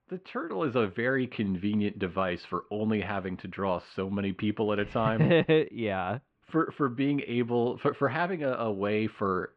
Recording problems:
muffled; very; fading above 3 kHz

